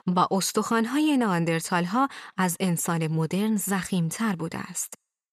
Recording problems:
none

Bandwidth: 13.5 kHz